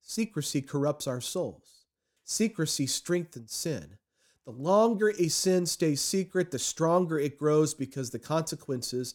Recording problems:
none

